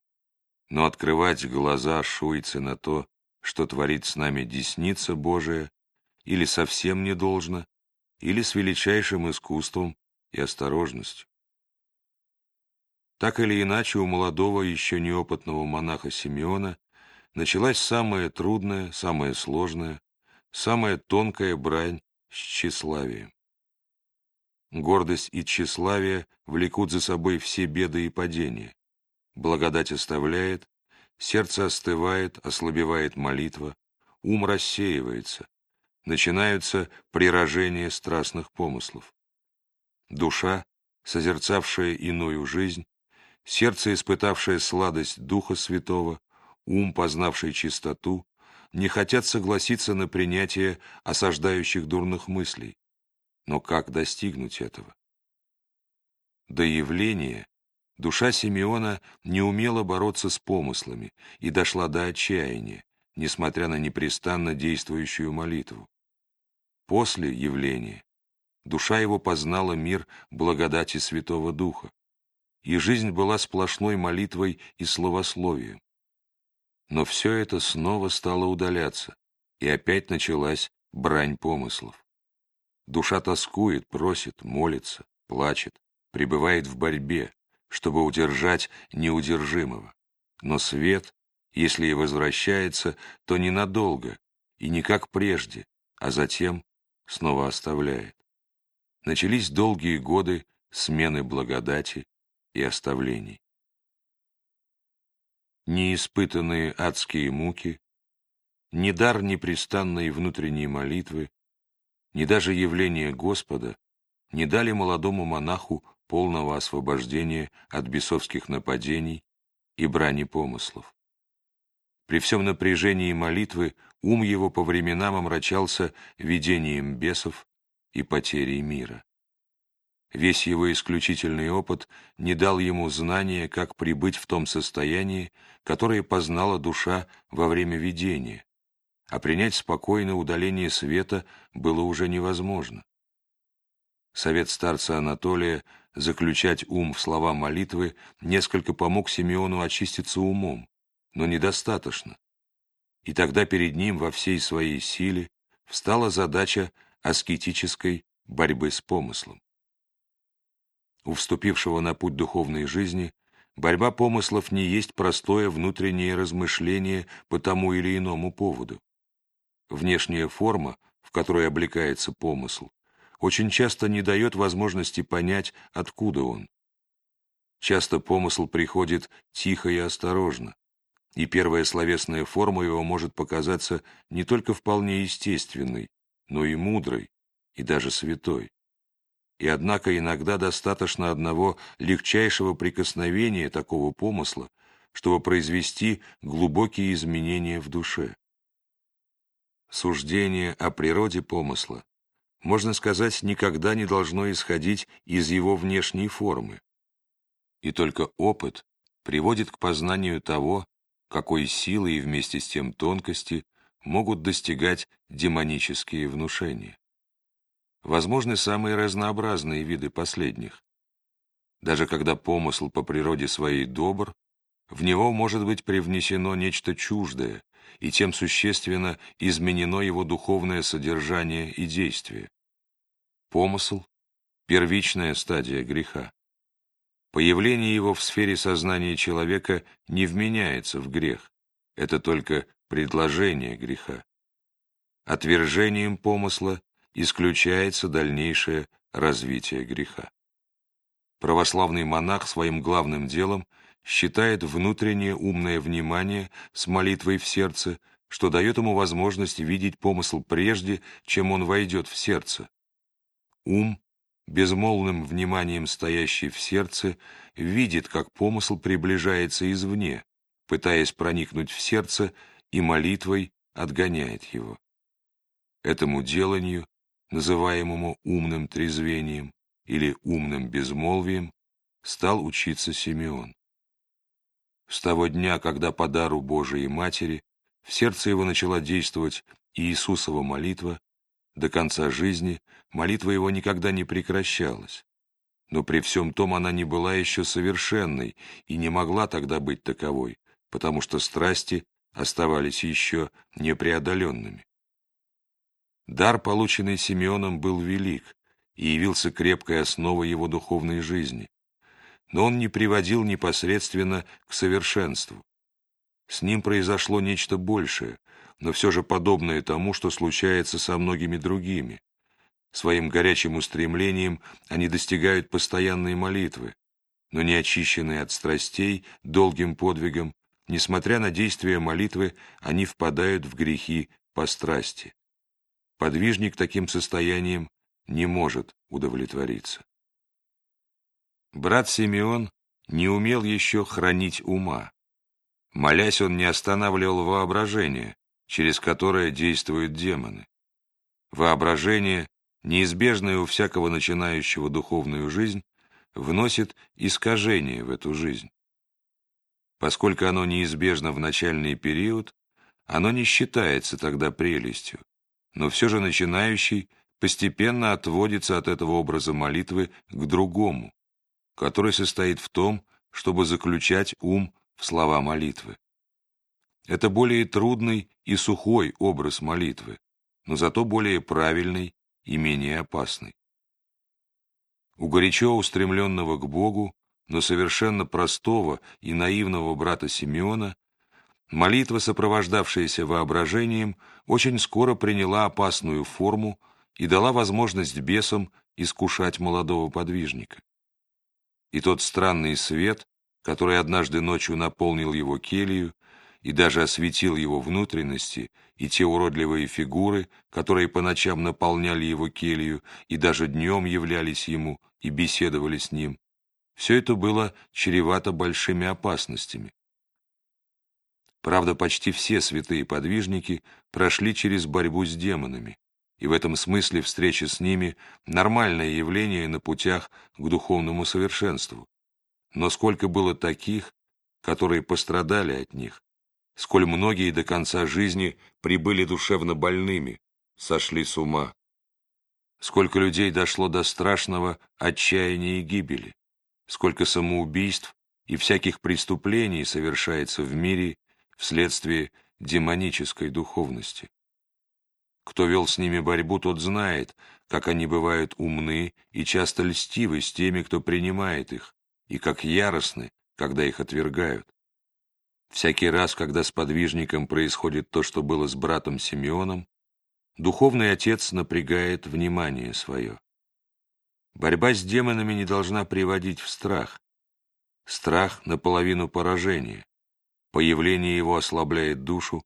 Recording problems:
none

